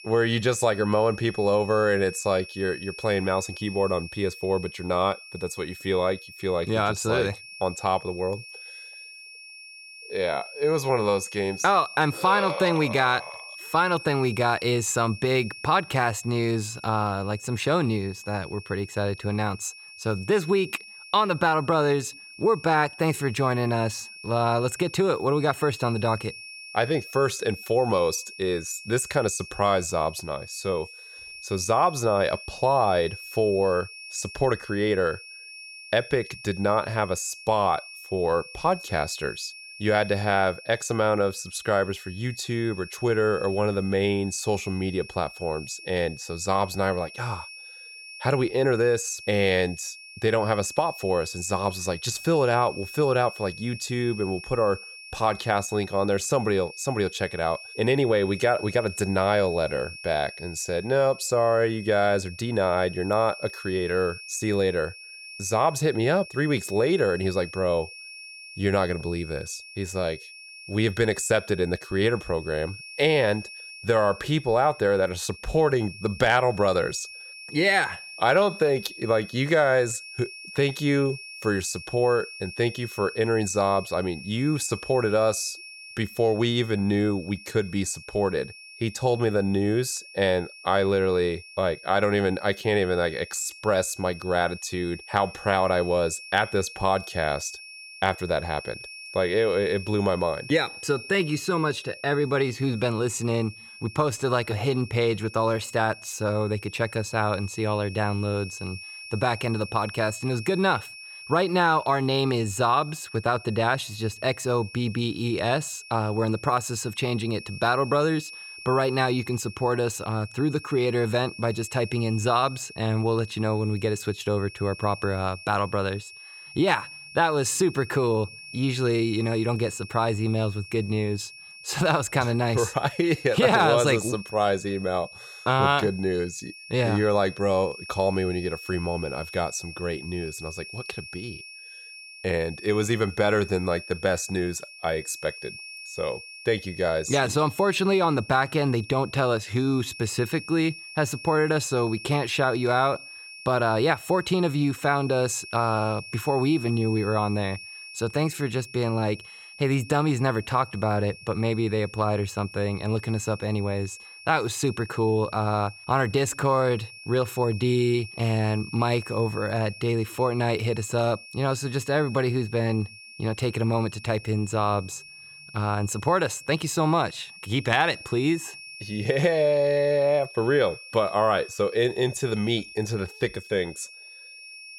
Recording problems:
high-pitched whine; noticeable; throughout; 2.5 kHz, 15 dB below the speech

